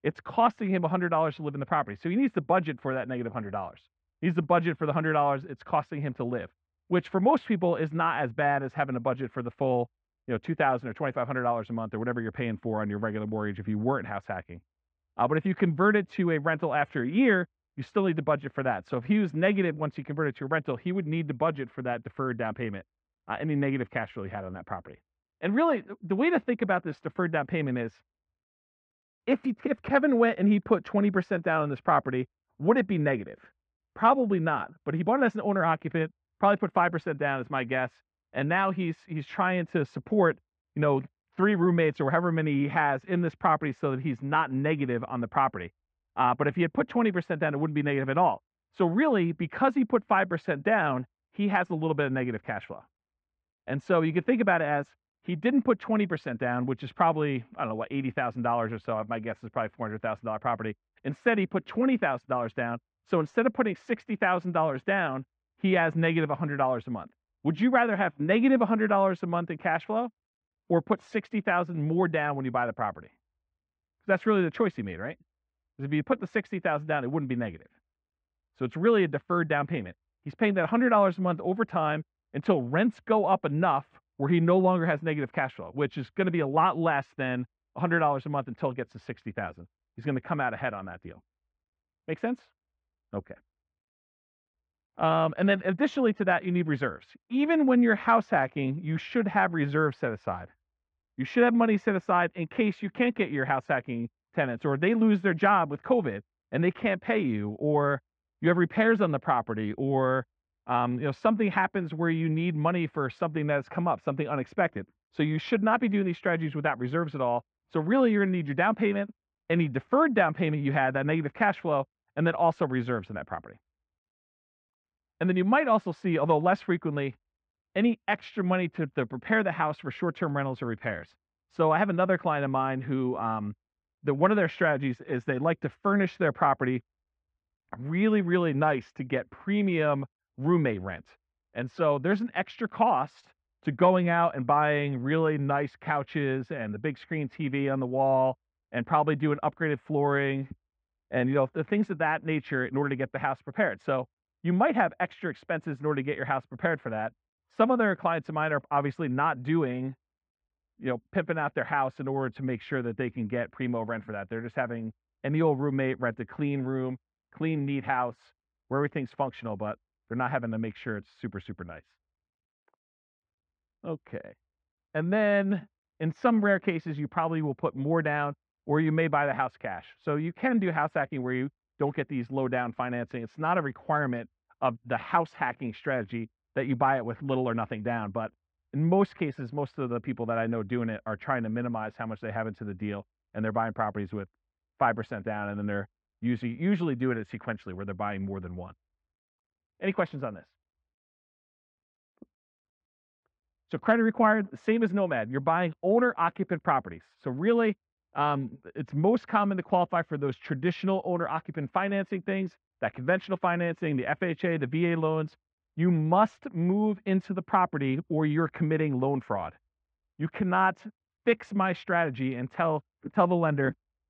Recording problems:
muffled; very; fading above 2 kHz

